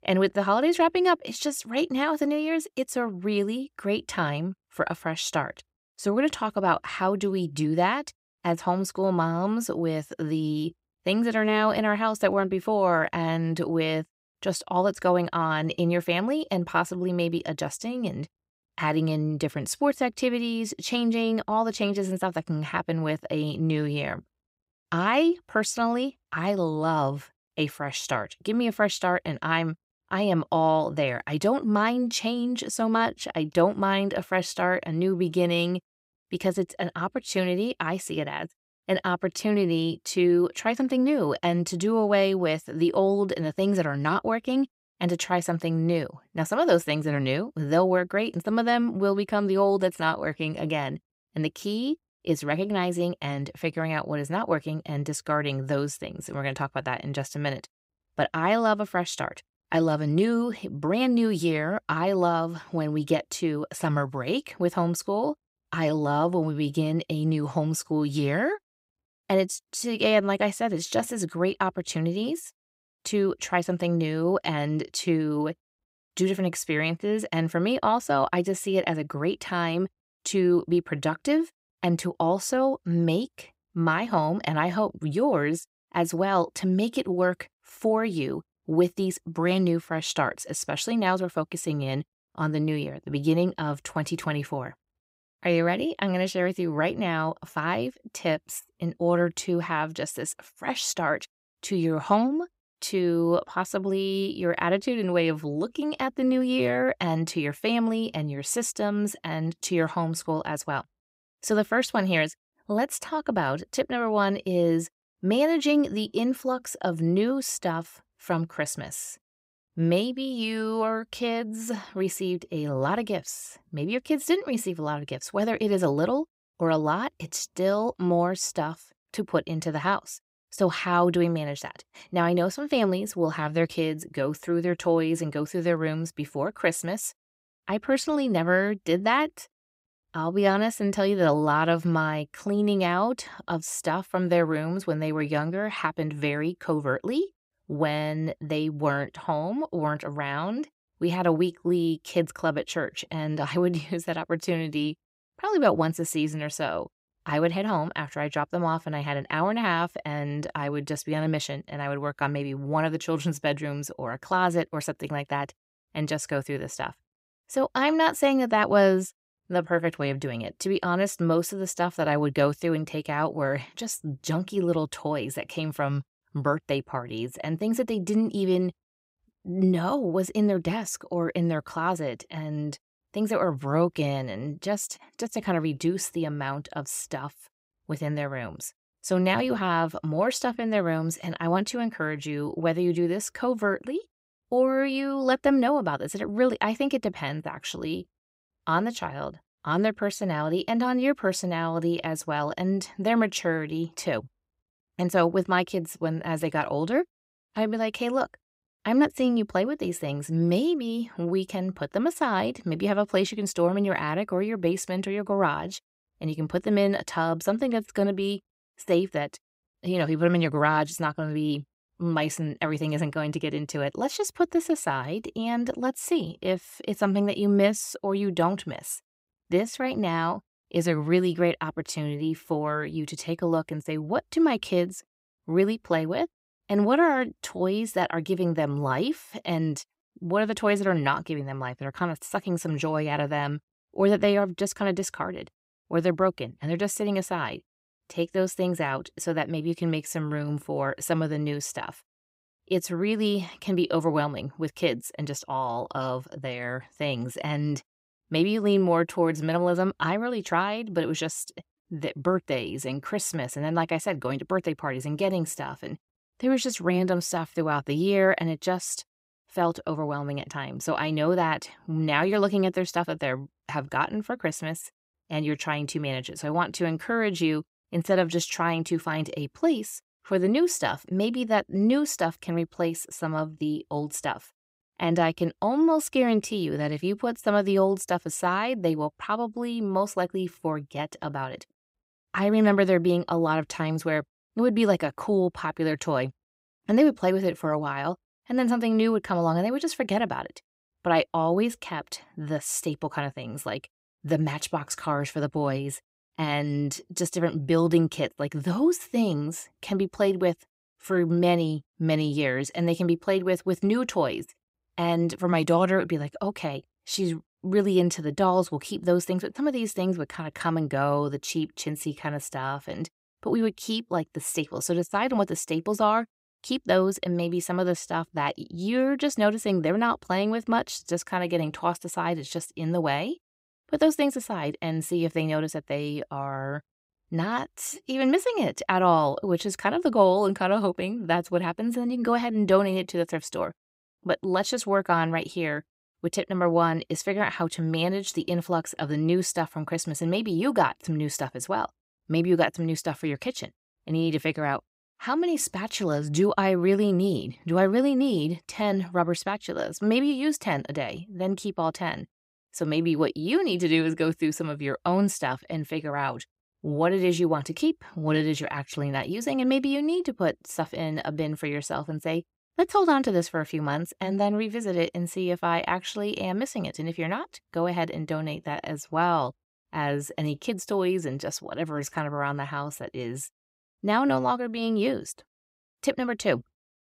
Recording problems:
none

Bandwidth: 15.5 kHz